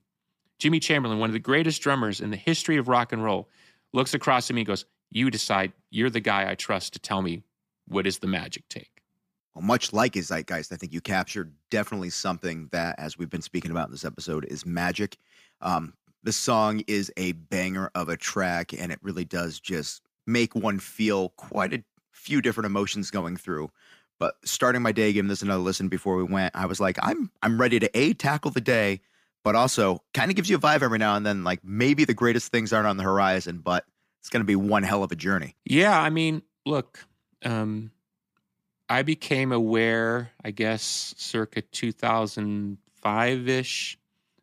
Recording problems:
none

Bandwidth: 15 kHz